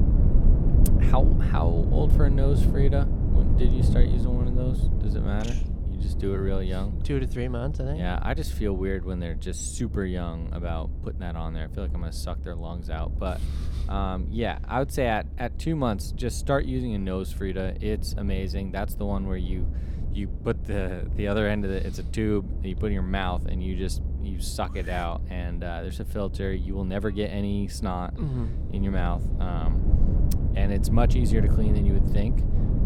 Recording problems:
low rumble; loud; throughout; 9 dB below the speech

